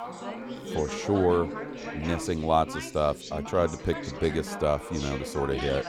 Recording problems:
background chatter; loud; throughout; 3 voices, 8 dB below the speech

